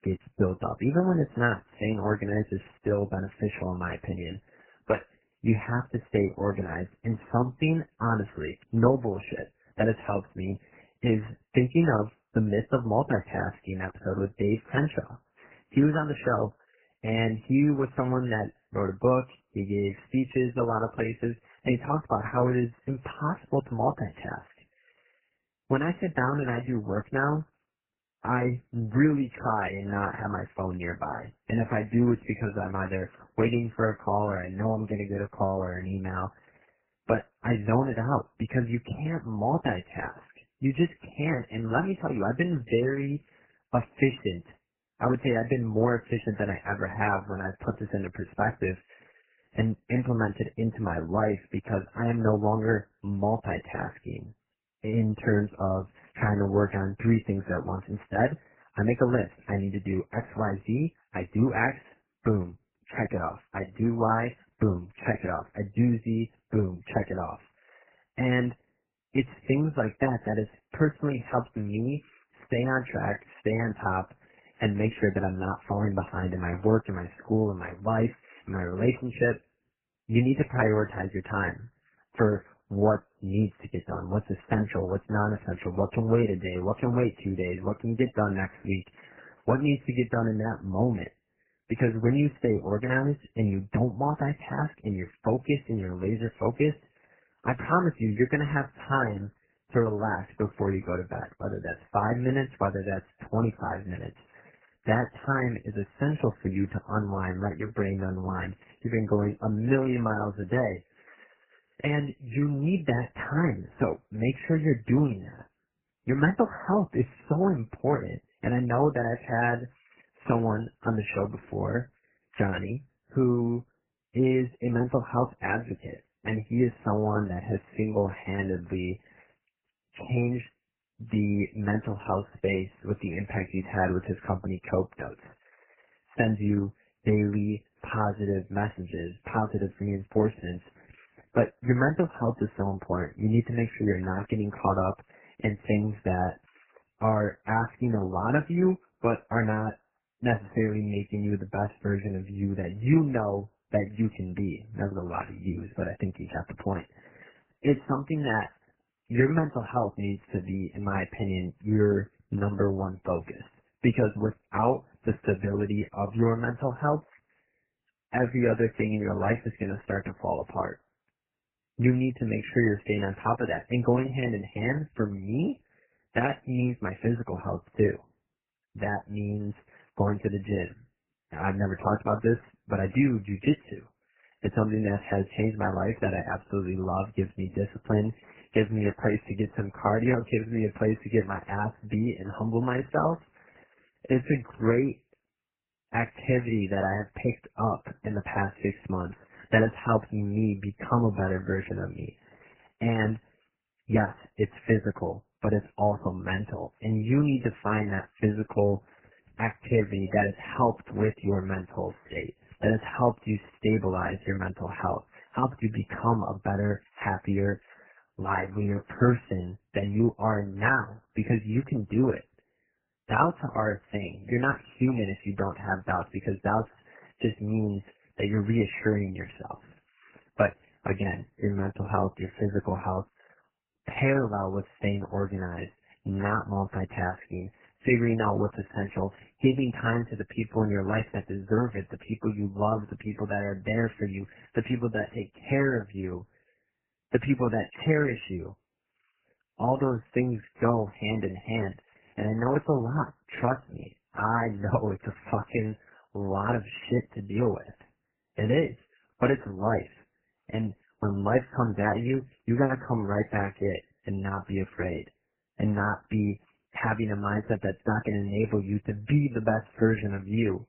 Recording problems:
garbled, watery; badly; nothing above 3 kHz

